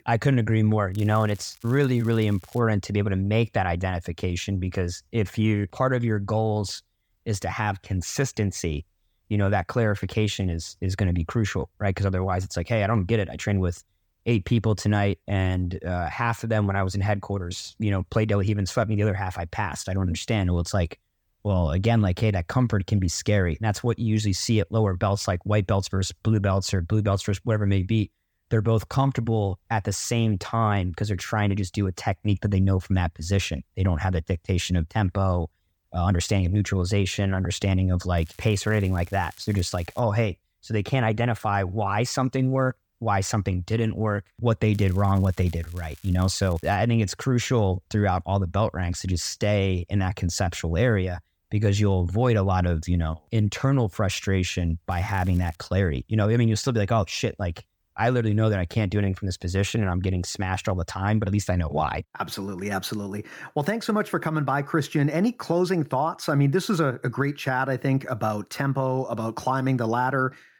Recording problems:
crackling; faint; 4 times, first at 1 s; 25 dB below the speech

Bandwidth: 18.5 kHz